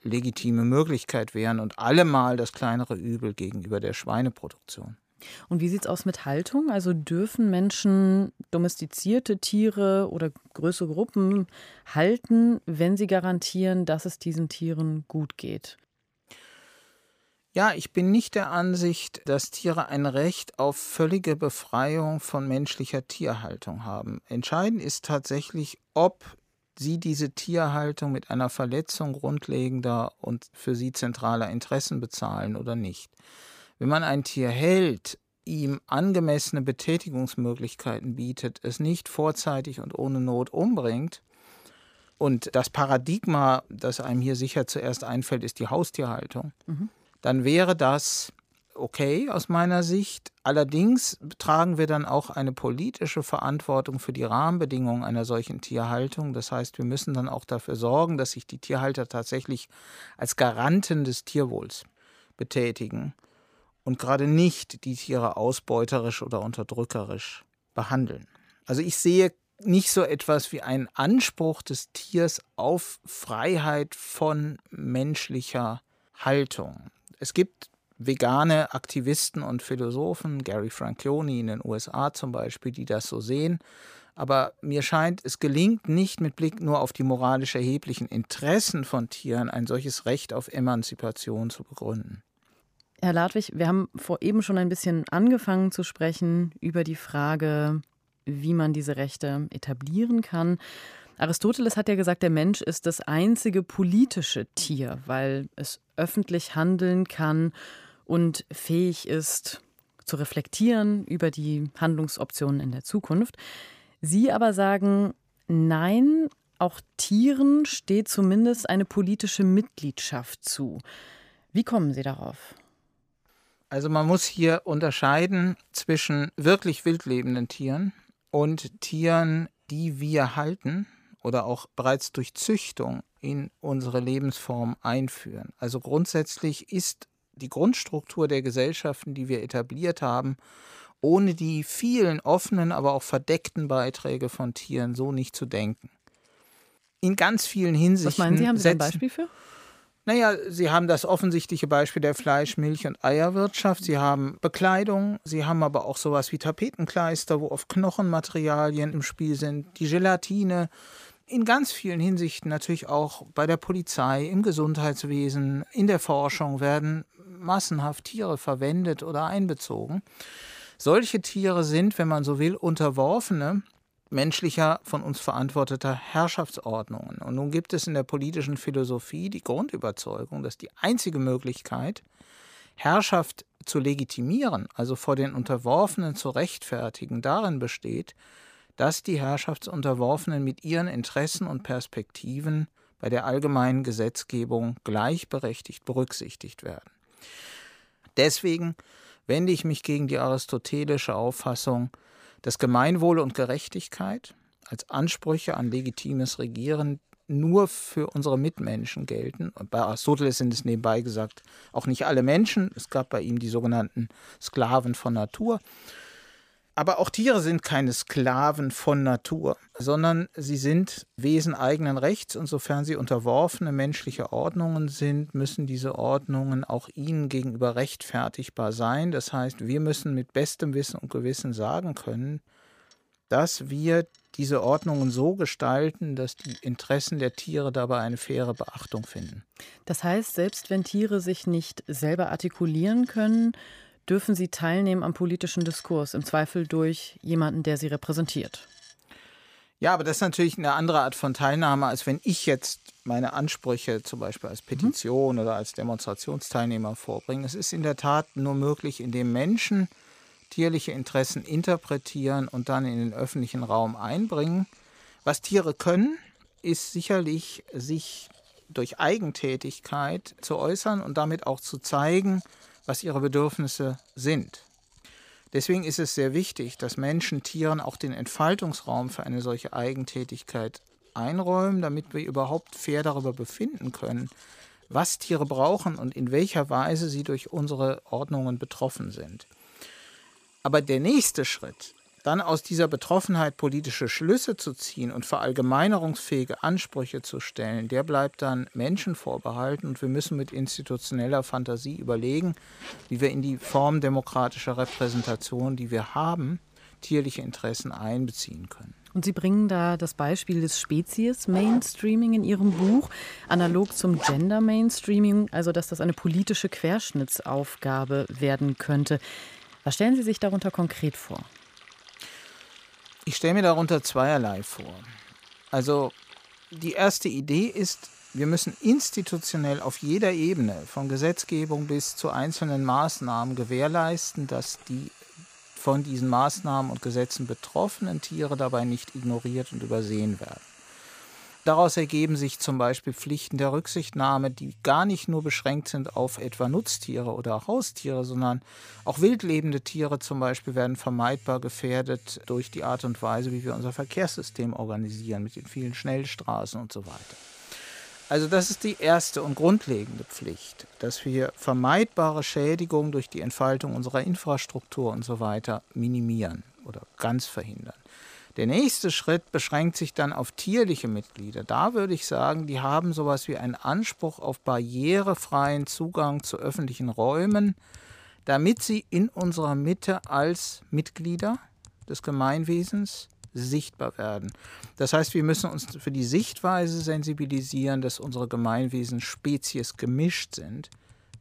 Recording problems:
household noises; faint; throughout; 25 dB below the speech

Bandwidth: 15 kHz